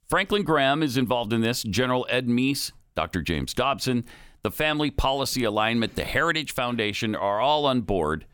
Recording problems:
none

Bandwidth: 18.5 kHz